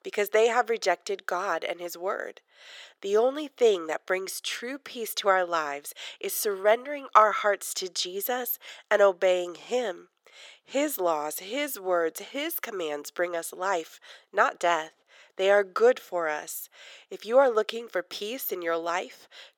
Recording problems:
thin; very; fading below 450 Hz

